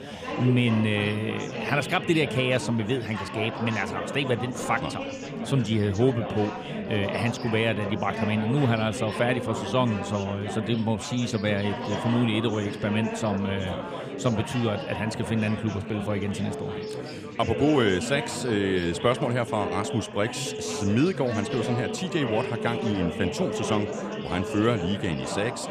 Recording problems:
chatter from many people; loud; throughout; 6 dB below the speech
phone ringing; noticeable; from 17 to 25 s; peak 8 dB below the speech

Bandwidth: 15 kHz